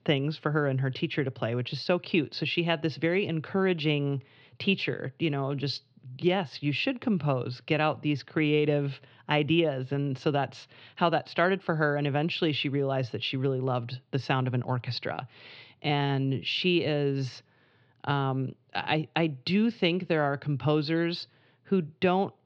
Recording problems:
muffled; very slightly; fading above 4 kHz

